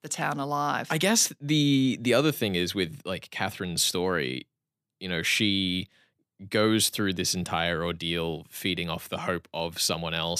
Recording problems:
abrupt cut into speech; at the end

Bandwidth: 14.5 kHz